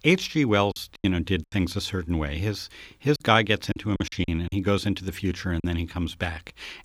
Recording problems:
choppy; very; at 0.5 s, at 3 s and from 3.5 to 5.5 s; 13% of the speech affected

